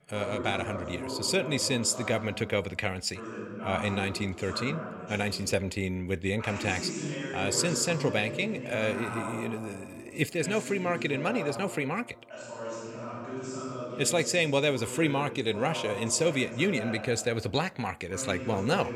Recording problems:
voice in the background; loud; throughout; 8 dB below the speech

